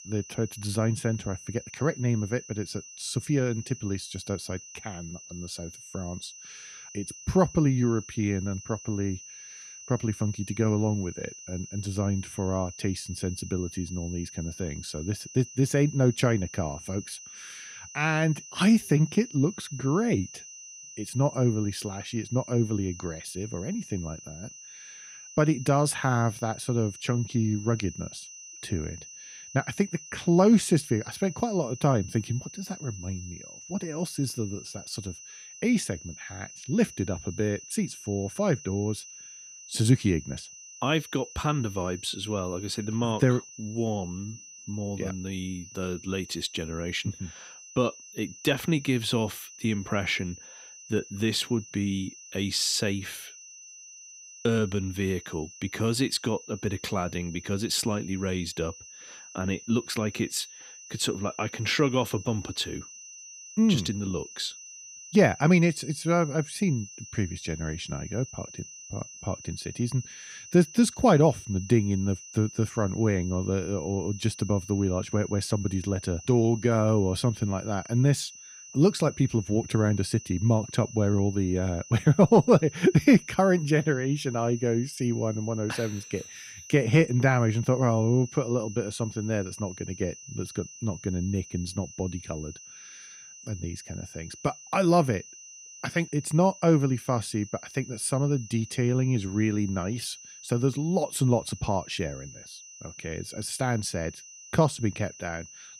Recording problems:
high-pitched whine; noticeable; throughout; 6 kHz, 15 dB below the speech

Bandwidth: 15.5 kHz